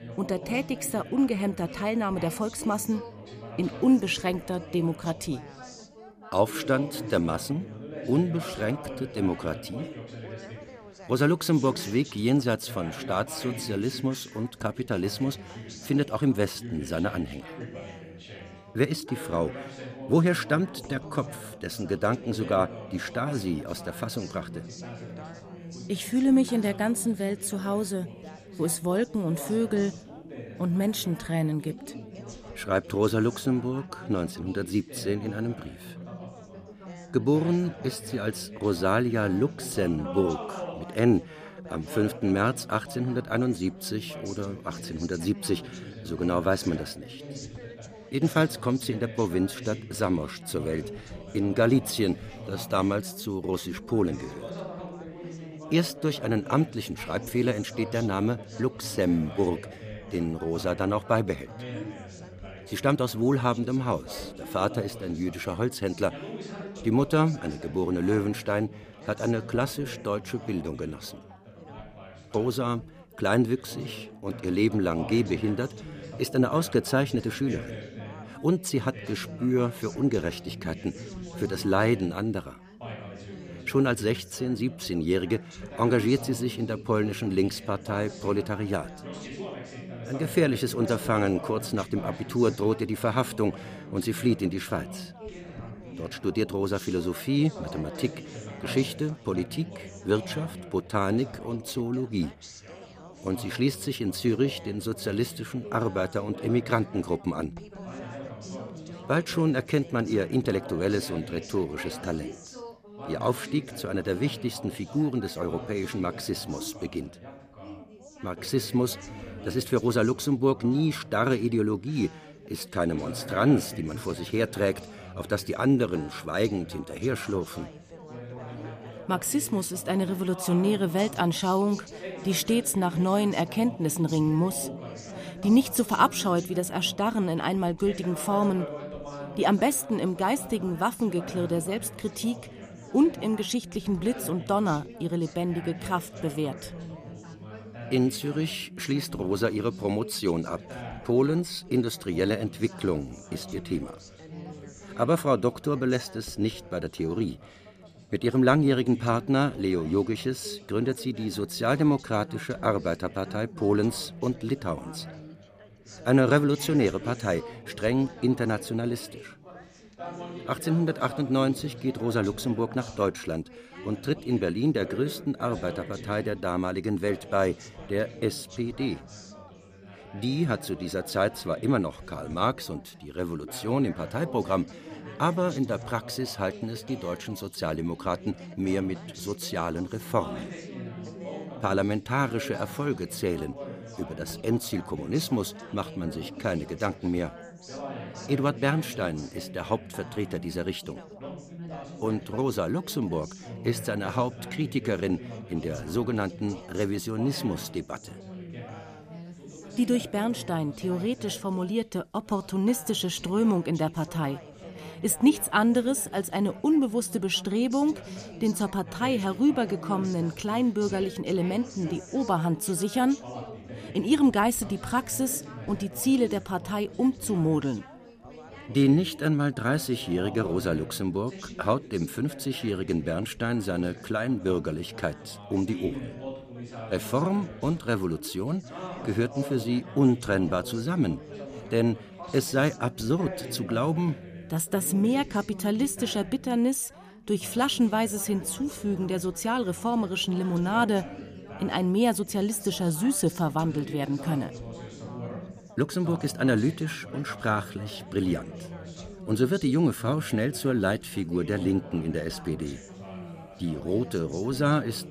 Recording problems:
background chatter; noticeable; throughout; 4 voices, 15 dB below the speech

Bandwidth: 15 kHz